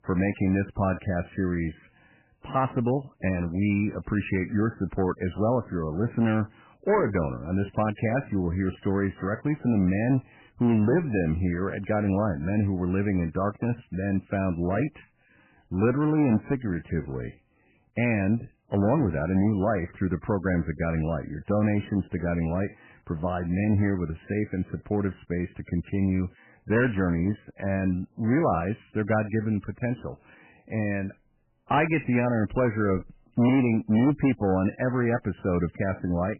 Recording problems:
garbled, watery; badly; nothing above 2.5 kHz
distortion; slight; 5% of the sound clipped

